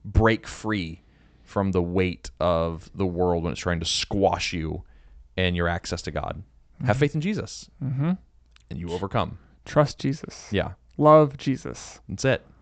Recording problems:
high frequencies cut off; noticeable; nothing above 8 kHz

